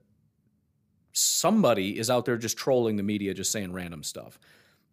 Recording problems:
none

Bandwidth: 15 kHz